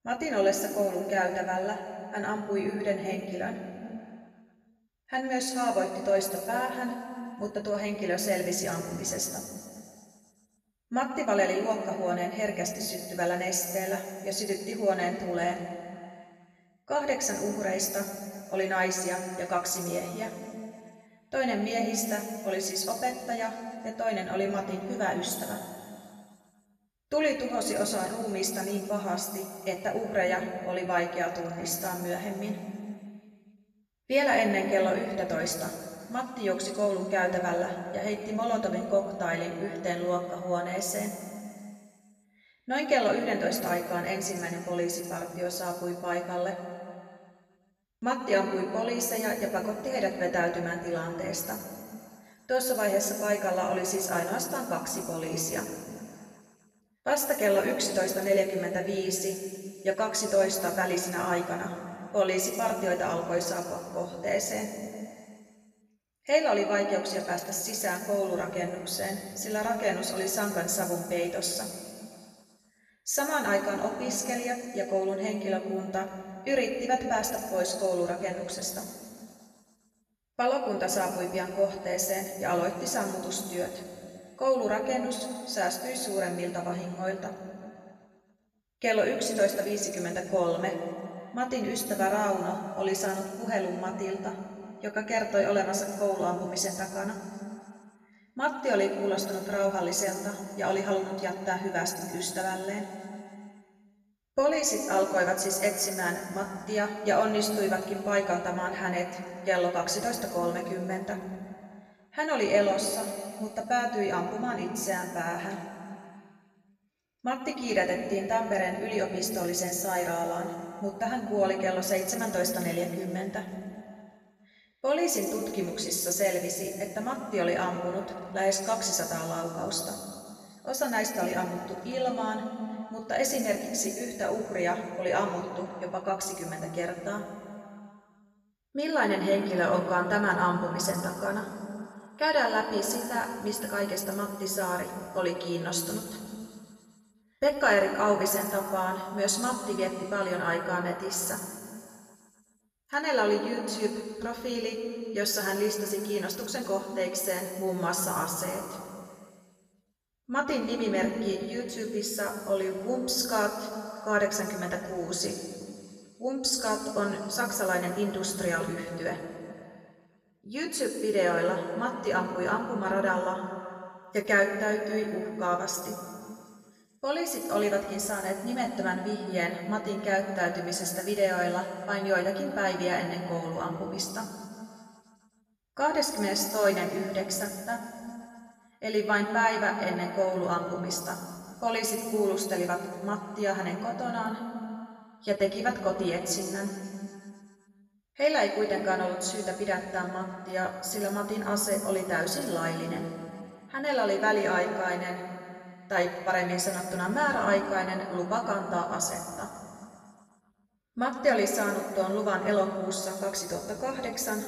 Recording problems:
off-mic speech; far
room echo; noticeable; dies away in 2.1 s

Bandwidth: 14.5 kHz